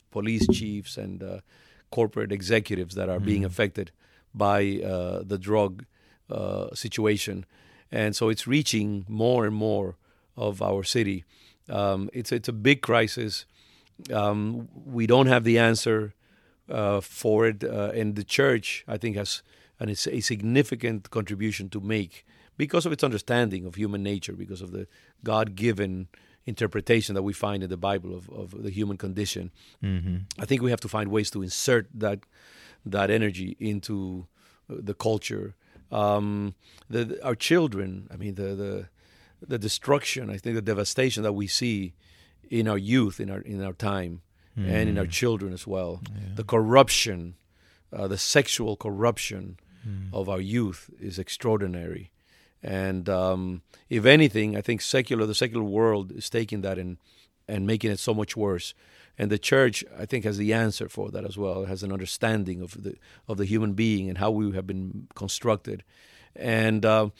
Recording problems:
none

